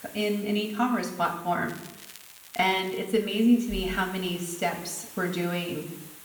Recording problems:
room echo; slight; dies away in 0.8 s
off-mic speech; somewhat distant
hiss; noticeable; throughout; 15 dB below the speech
crackling; noticeable; from 1.5 to 3 s; 20 dB below the speech

